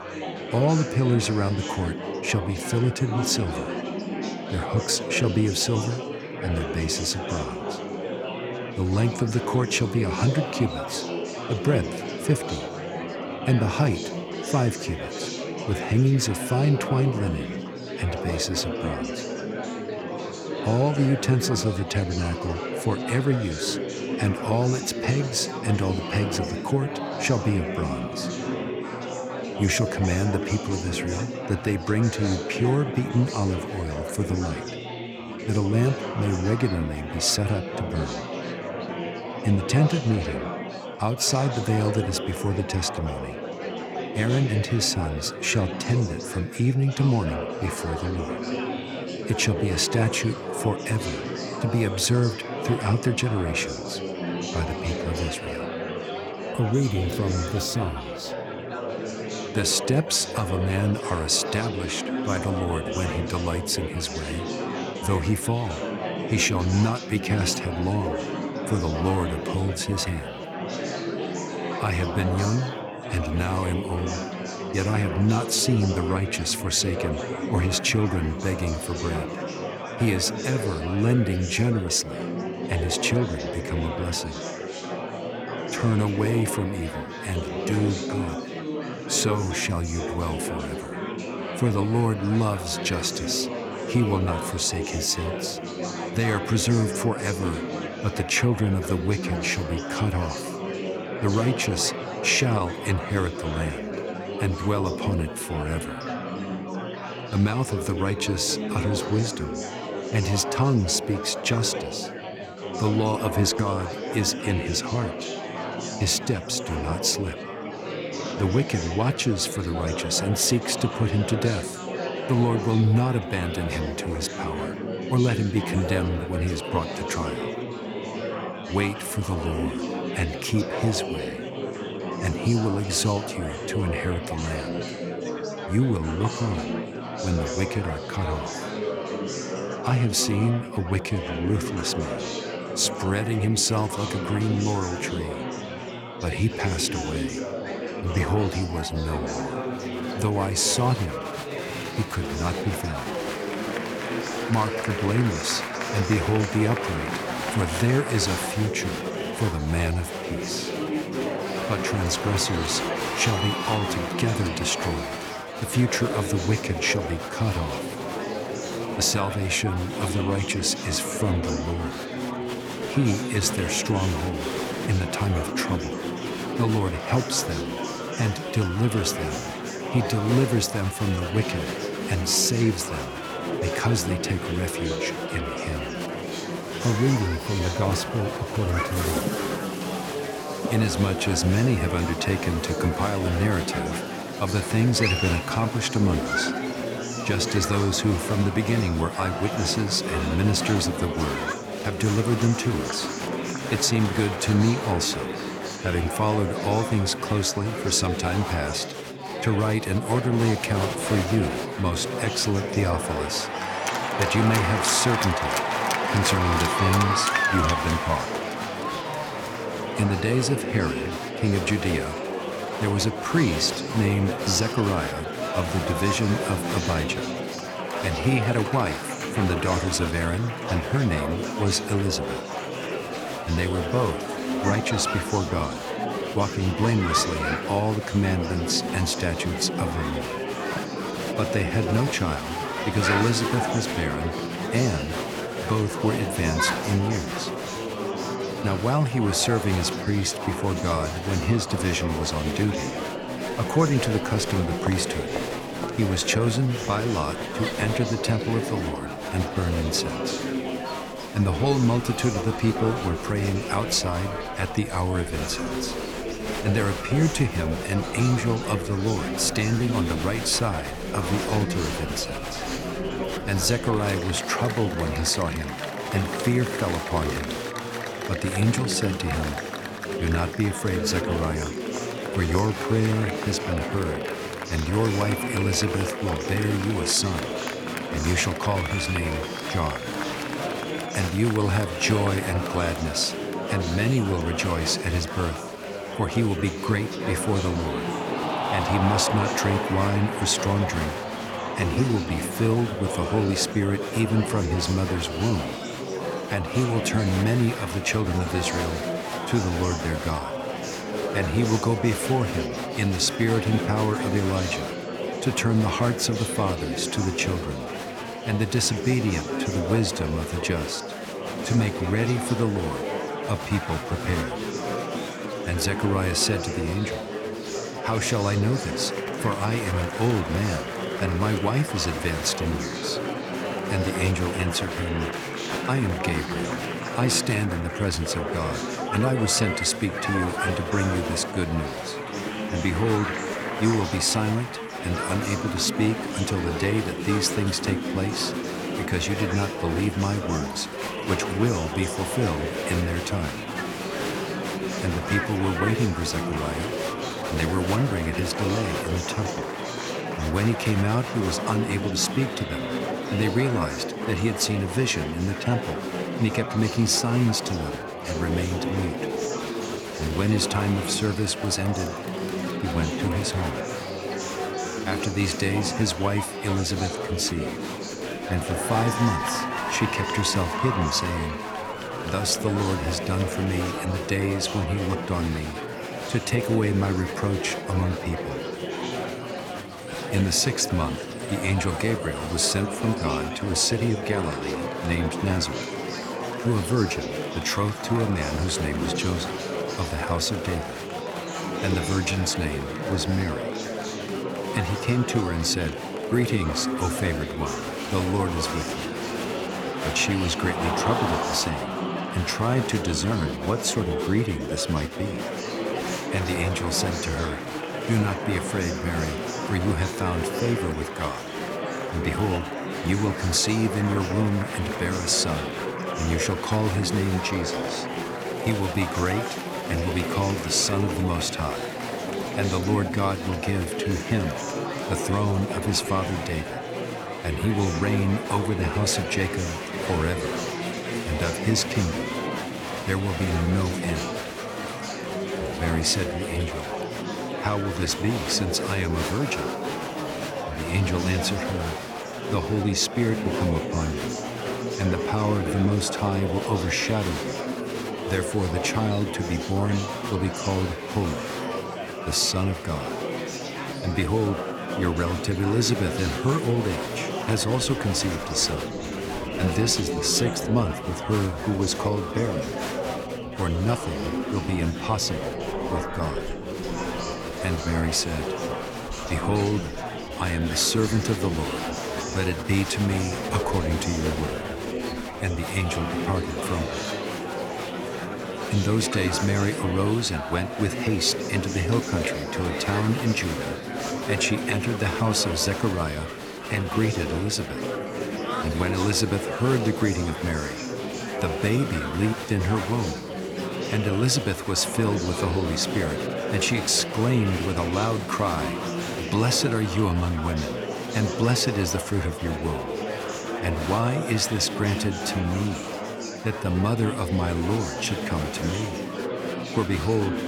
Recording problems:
murmuring crowd; loud; throughout; 4 dB below the speech

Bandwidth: 18.5 kHz